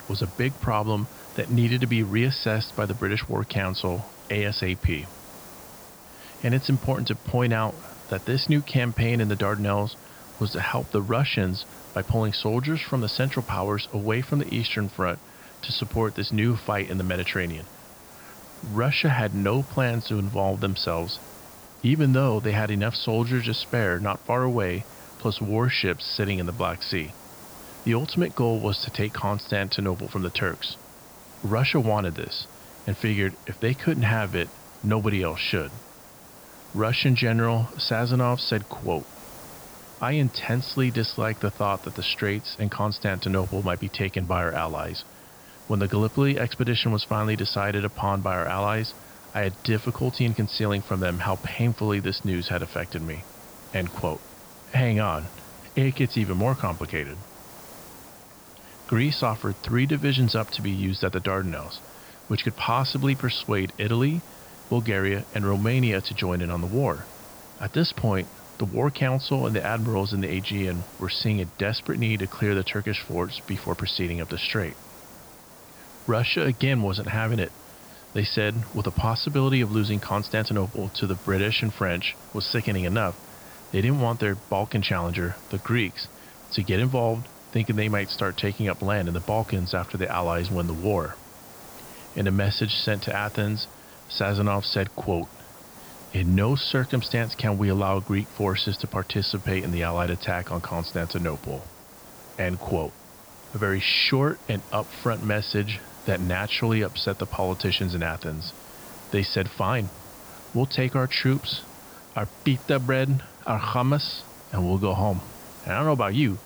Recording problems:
high frequencies cut off; noticeable; nothing above 5.5 kHz
hiss; noticeable; throughout; 20 dB below the speech

